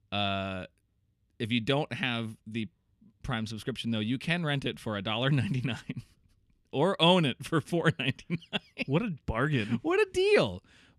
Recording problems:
none

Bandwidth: 14.5 kHz